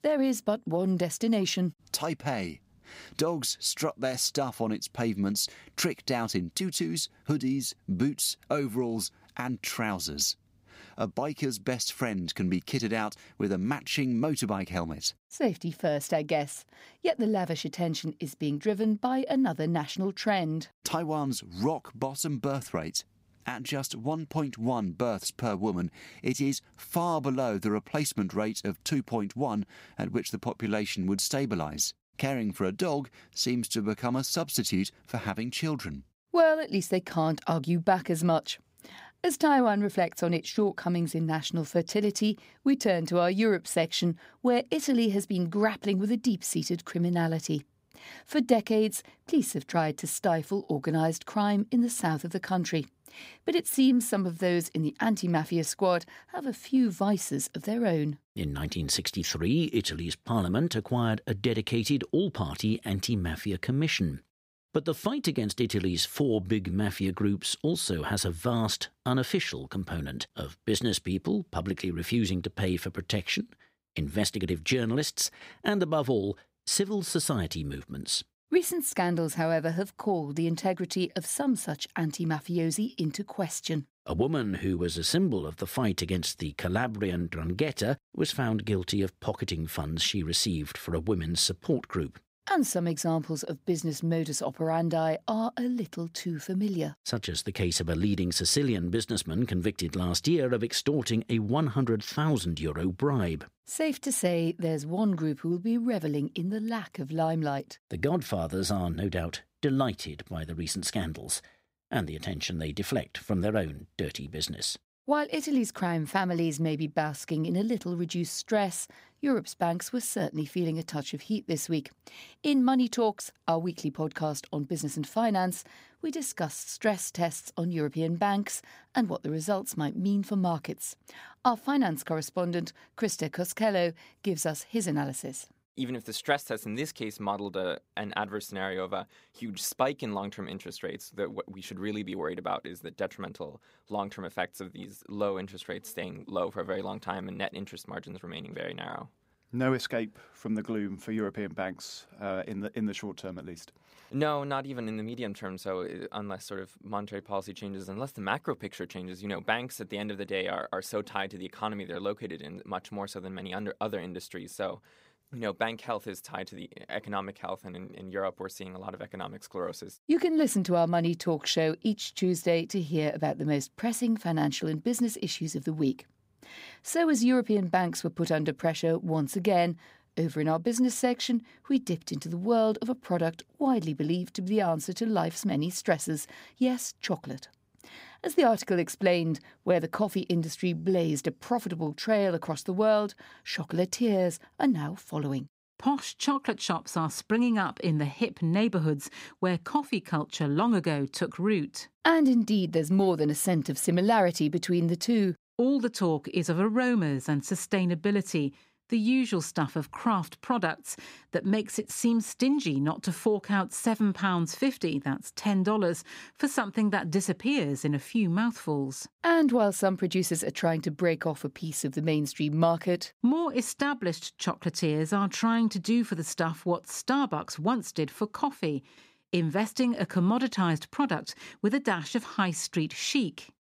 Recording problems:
none

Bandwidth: 15.5 kHz